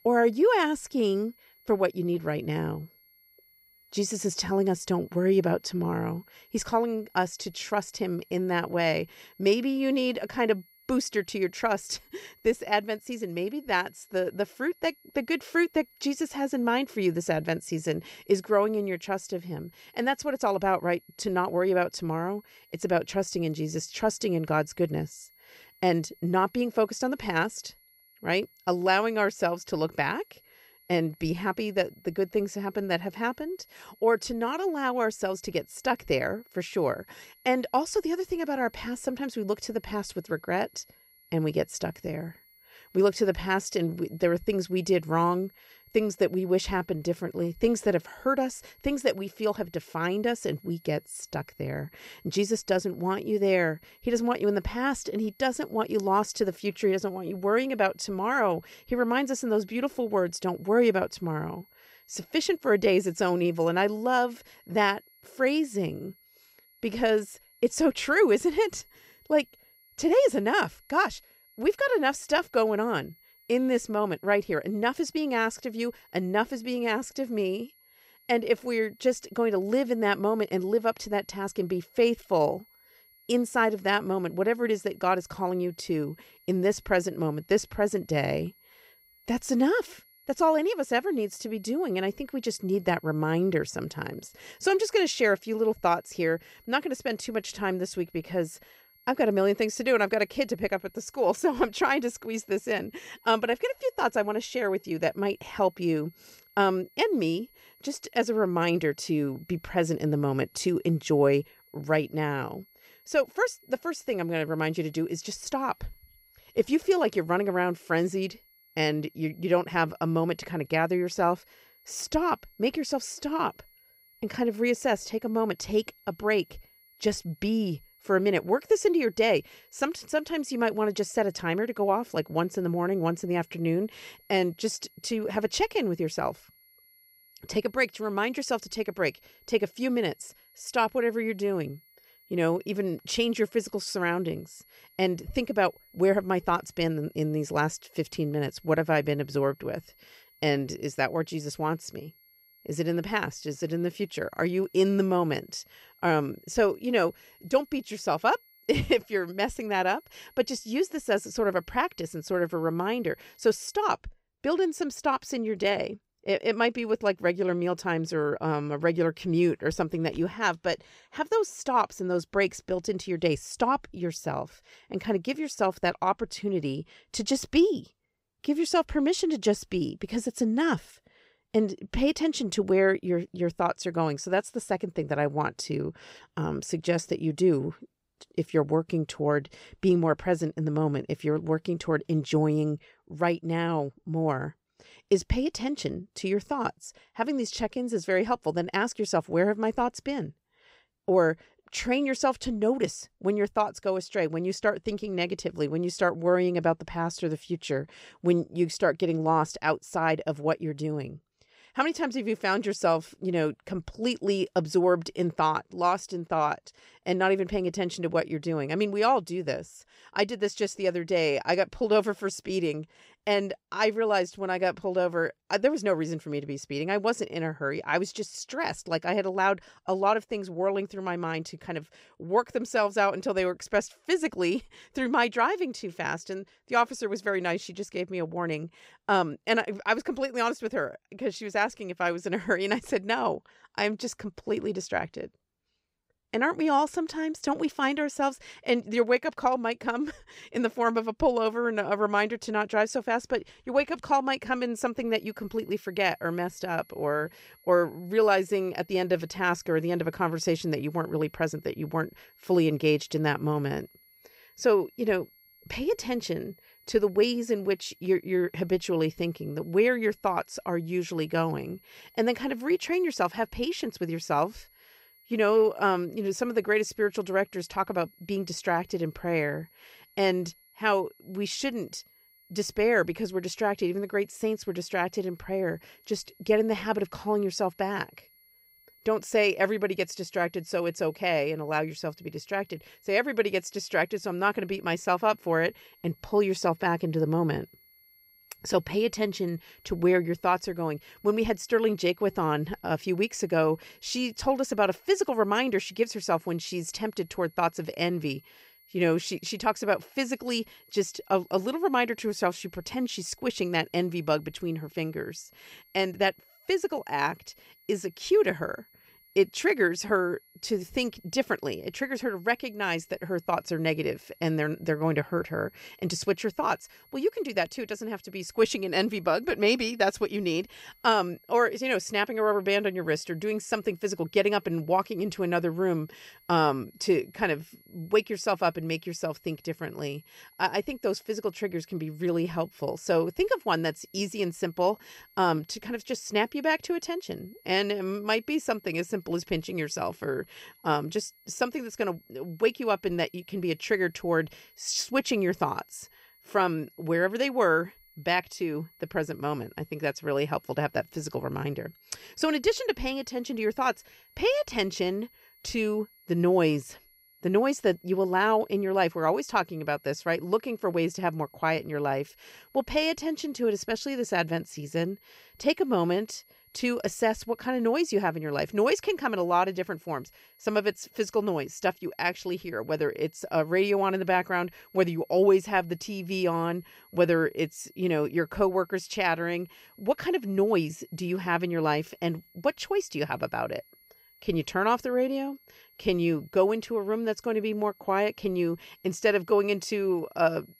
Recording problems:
high-pitched whine; faint; until 2:44 and from 4:15 on; 11.5 kHz, 30 dB below the speech

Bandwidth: 15.5 kHz